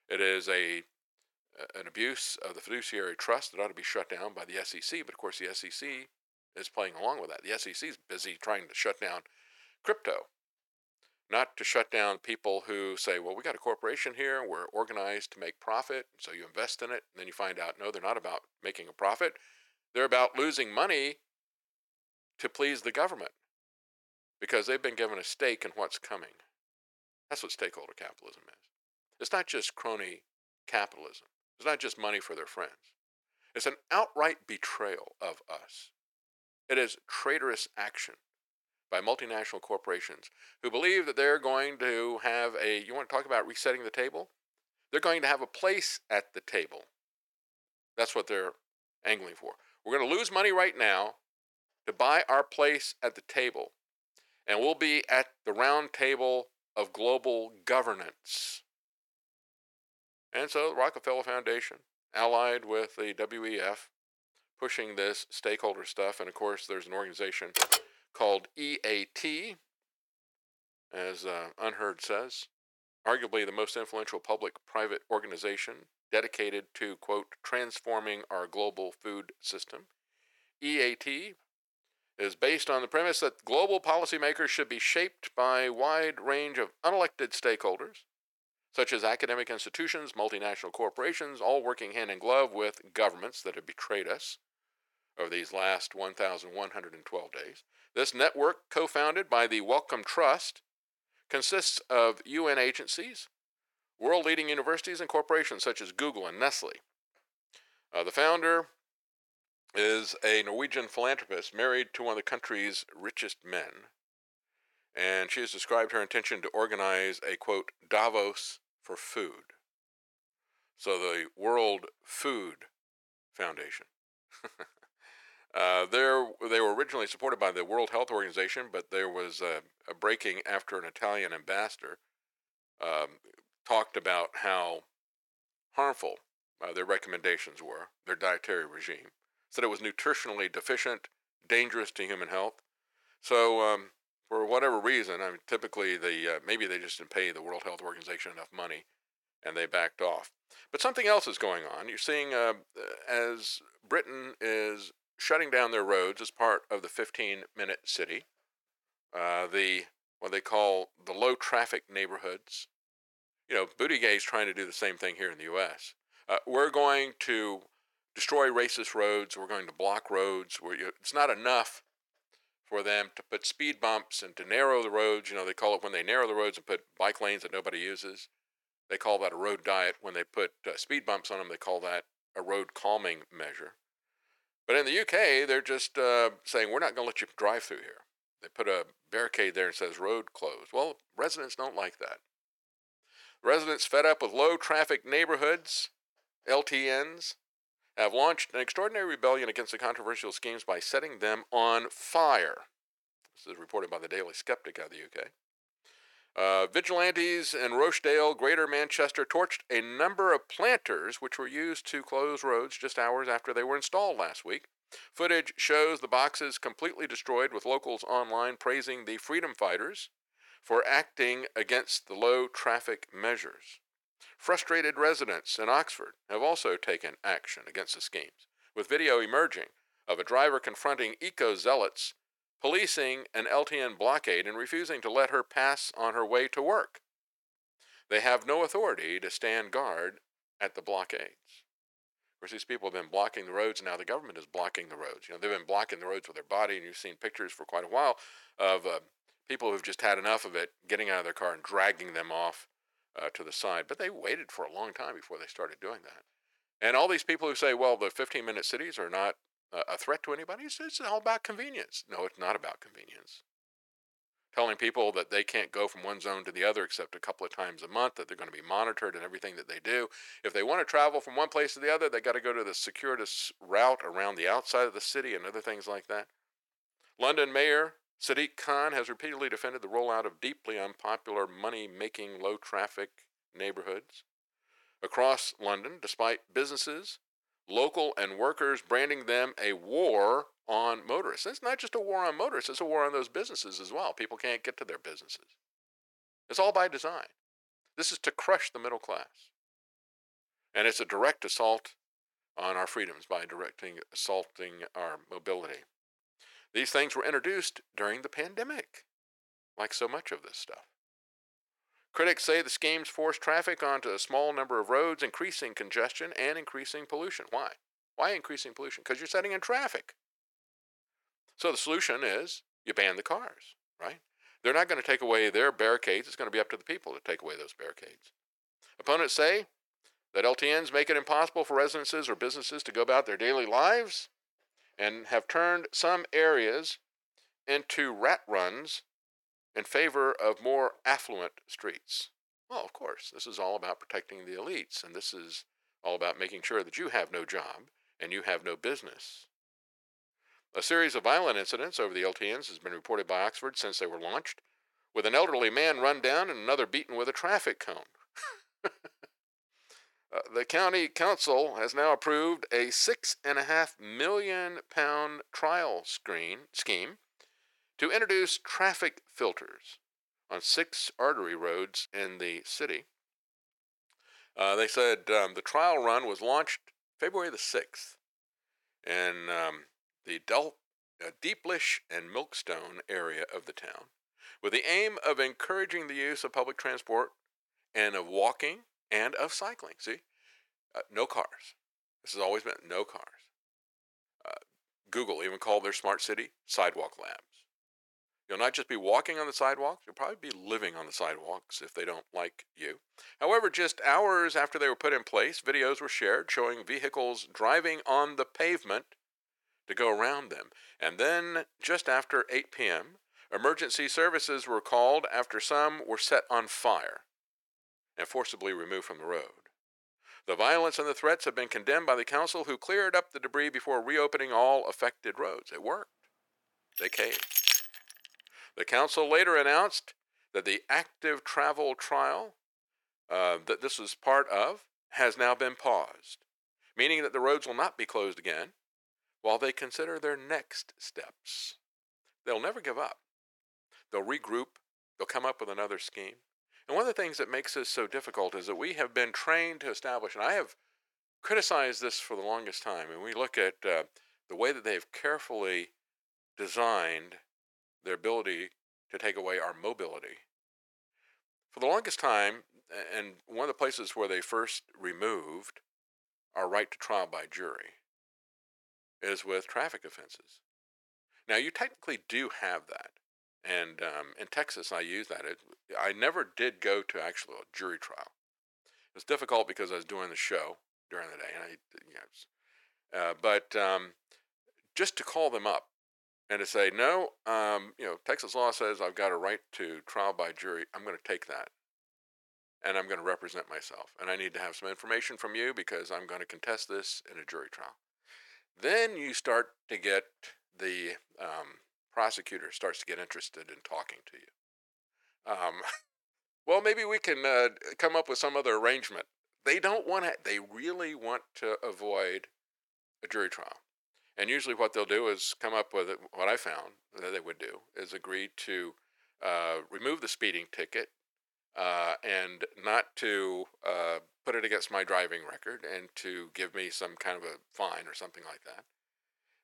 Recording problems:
thin; very; fading below 500 Hz
keyboard typing; loud; at 1:08; peak 6 dB above the speech
jangling keys; loud; at 7:07; peak 7 dB above the speech

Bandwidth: 17.5 kHz